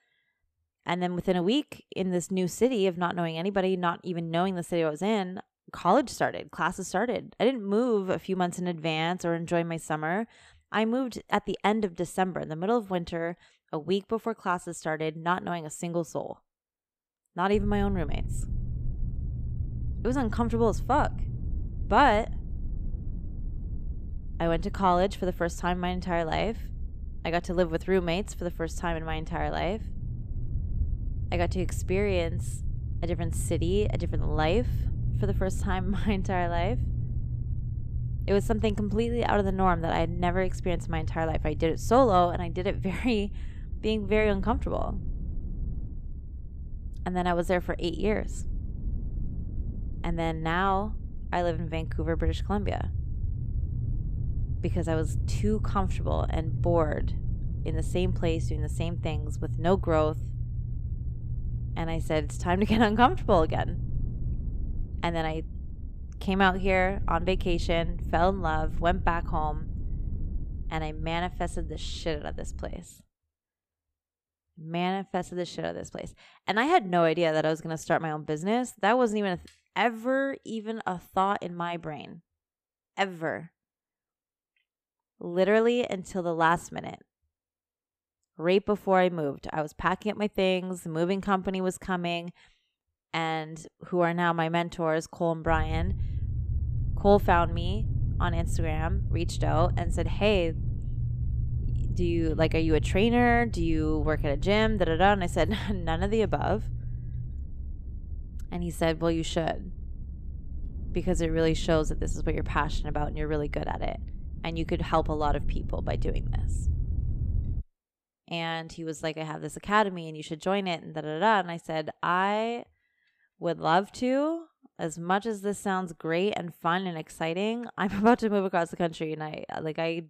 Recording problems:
low rumble; faint; from 18 s to 1:13 and from 1:35 to 1:58; 20 dB below the speech

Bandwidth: 14.5 kHz